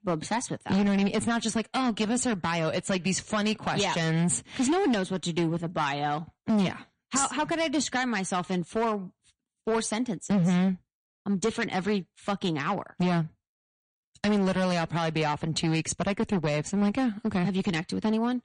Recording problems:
distortion; slight; 10% of the sound clipped
garbled, watery; slightly; nothing above 9.5 kHz

